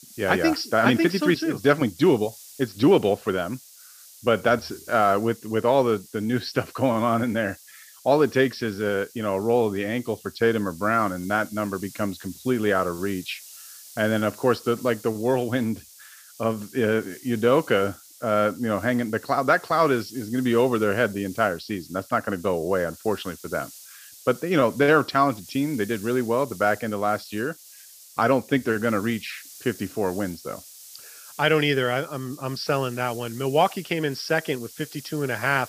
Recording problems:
high frequencies cut off; noticeable; nothing above 6 kHz
hiss; noticeable; throughout; 20 dB below the speech

